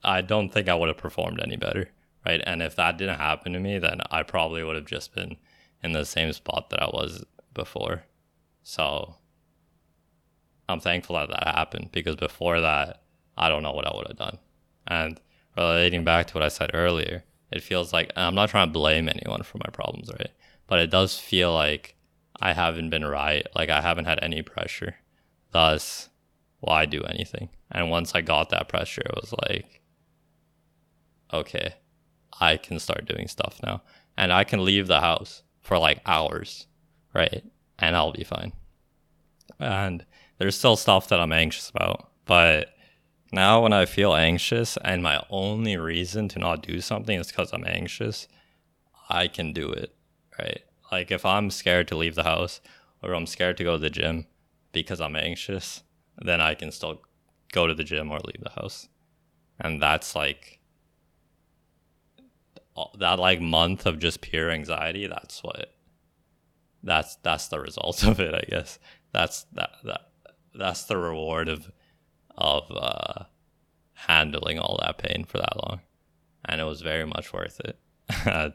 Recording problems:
uneven, jittery; strongly; from 11 s to 1:11

